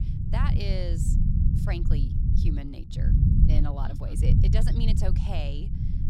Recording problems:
low rumble; loud; throughout; 1 dB below the speech

